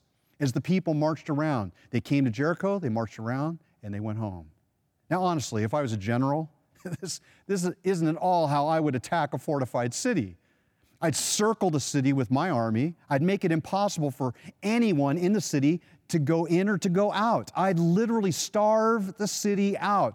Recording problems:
none

